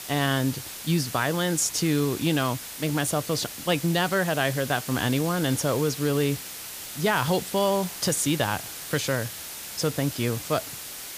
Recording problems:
hiss; loud; throughout; 9 dB below the speech

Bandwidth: 15 kHz